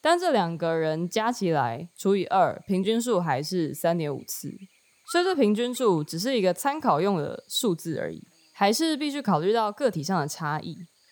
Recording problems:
electrical hum; faint; throughout; 50 Hz, 25 dB below the speech

